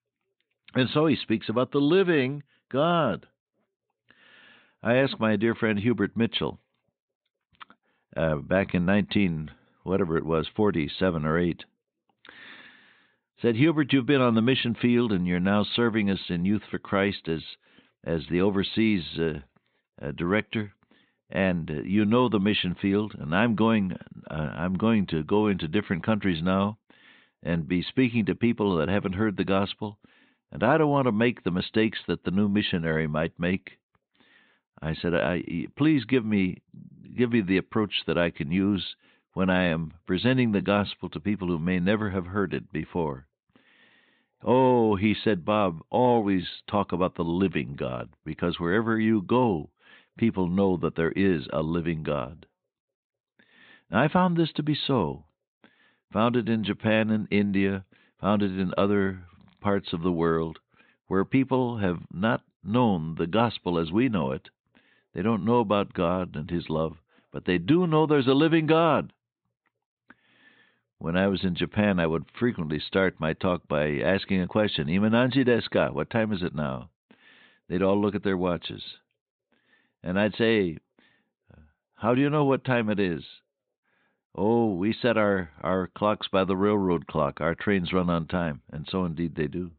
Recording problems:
high frequencies cut off; severe; nothing above 4 kHz

